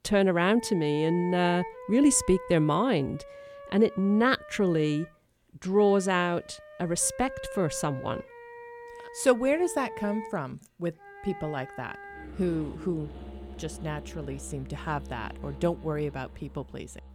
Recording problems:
background music; noticeable; throughout; 15 dB below the speech

